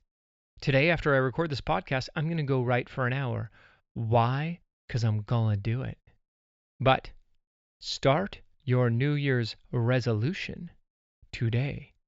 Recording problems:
high frequencies cut off; noticeable; nothing above 8 kHz

